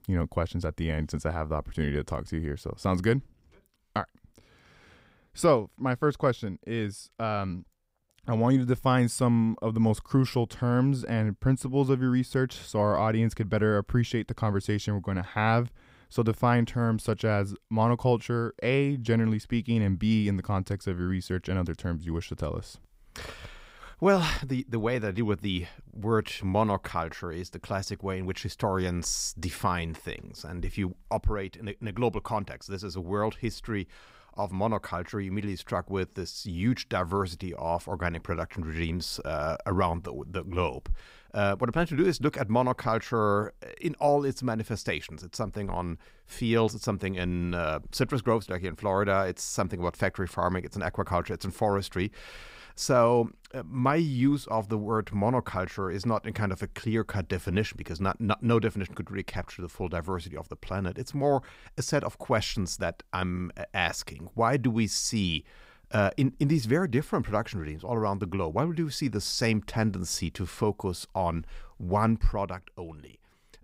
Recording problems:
none

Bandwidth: 15.5 kHz